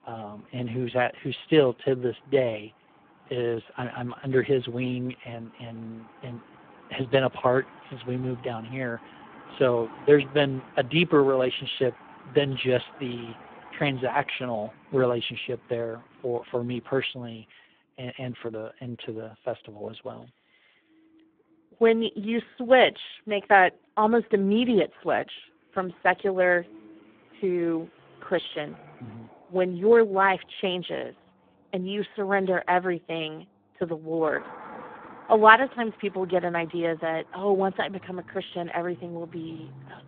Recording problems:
phone-call audio; poor line
traffic noise; faint; throughout; 25 dB below the speech

